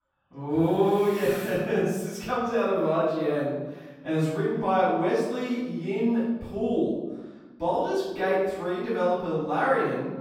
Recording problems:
room echo; strong; dies away in 1 s
off-mic speech; far

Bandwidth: 18 kHz